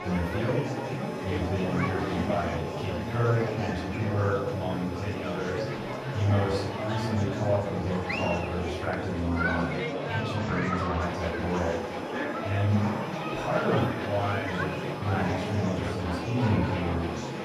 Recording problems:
off-mic speech; far
room echo; noticeable; dies away in 0.6 s
murmuring crowd; loud; throughout; 2 dB below the speech
background music; noticeable; throughout; 15 dB below the speech

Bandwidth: 14.5 kHz